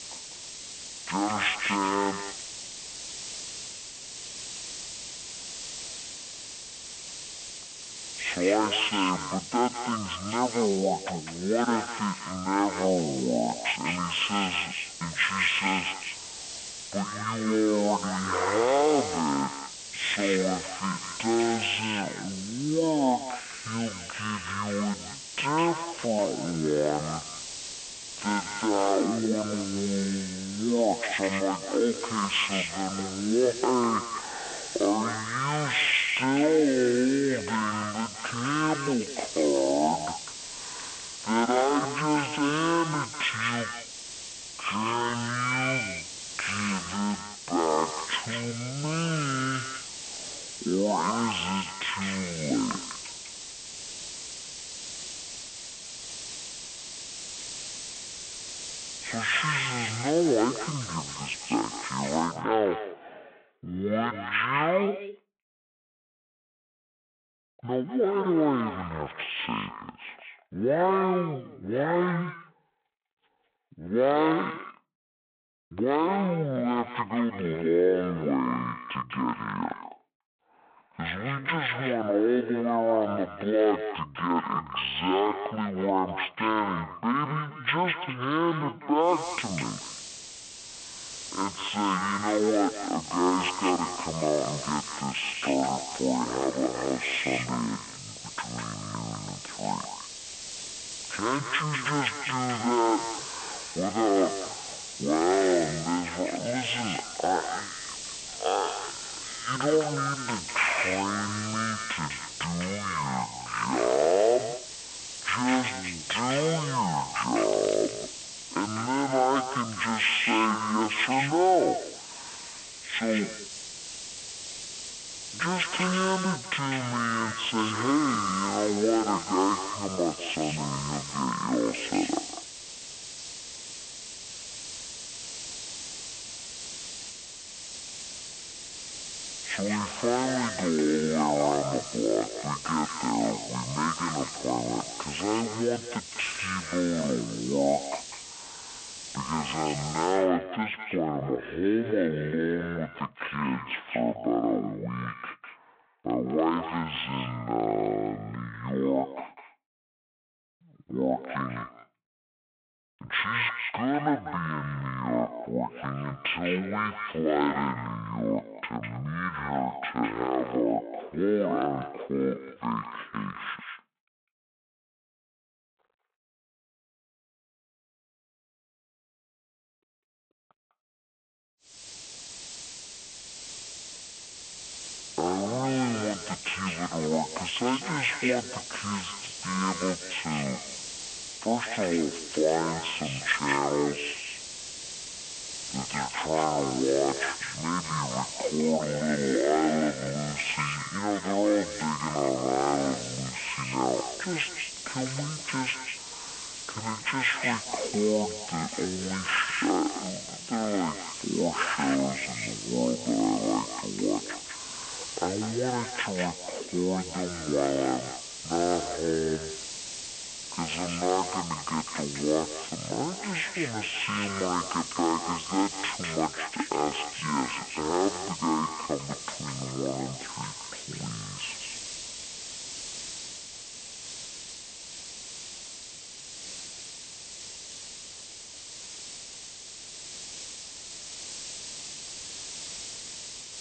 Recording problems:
echo of what is said; strong; throughout; 200 ms later, 9 dB below the speech
wrong speed and pitch; too slow and too low; 0.5 times normal speed
phone-call audio
hiss; loud; until 1:02, from 1:29 to 2:30 and from 3:02 on; 9 dB below the speech

